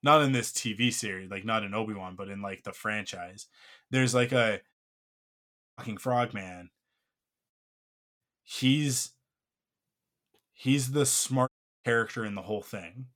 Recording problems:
audio cutting out; at 4.5 s for 1 s, at 7.5 s for 0.5 s and at 11 s

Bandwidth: 17.5 kHz